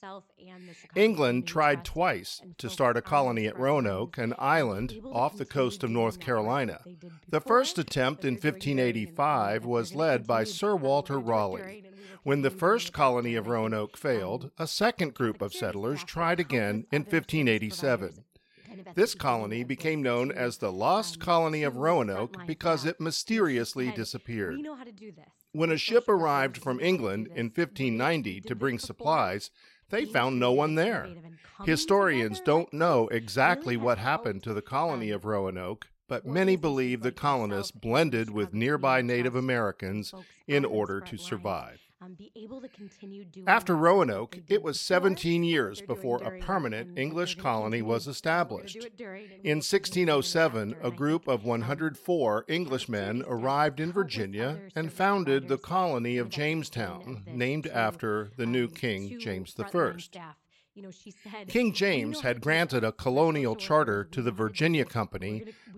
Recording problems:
voice in the background; noticeable; throughout; 20 dB below the speech

